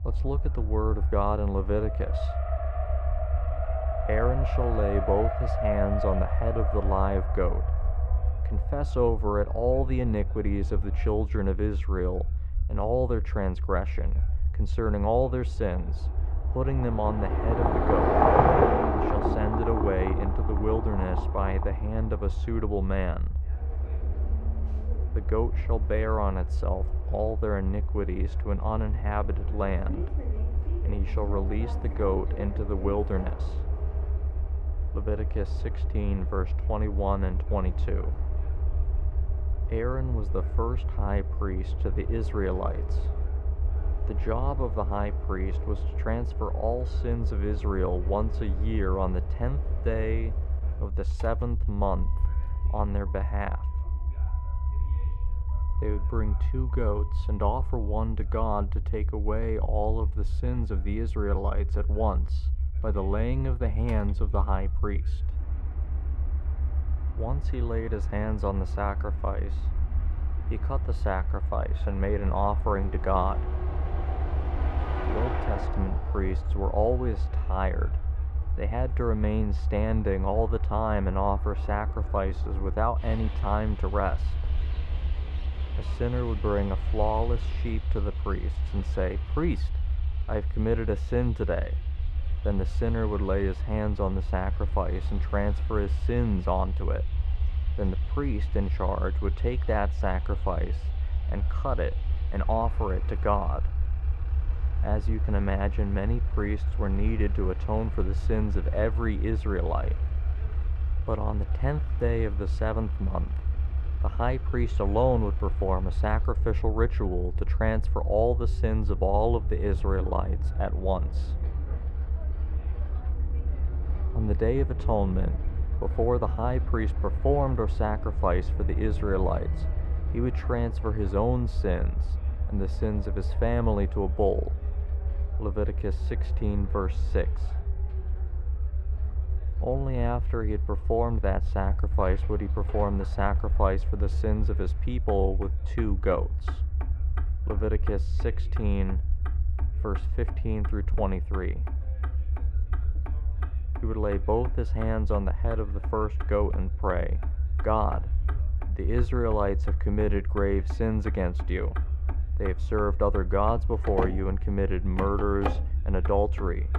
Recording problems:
muffled; very; fading above 4 kHz
traffic noise; loud; throughout; 7 dB below the speech
low rumble; noticeable; throughout; 20 dB below the speech
voice in the background; faint; throughout; 30 dB below the speech

